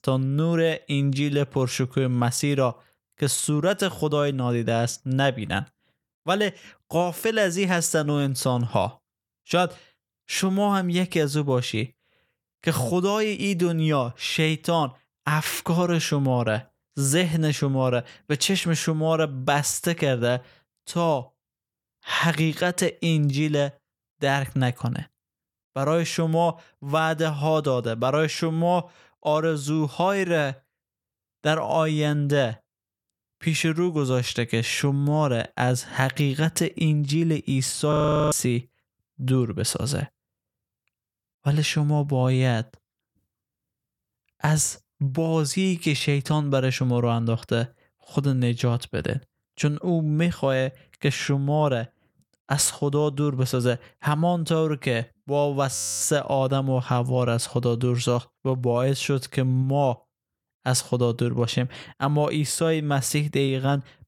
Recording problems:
audio freezing; at 38 s and at 56 s

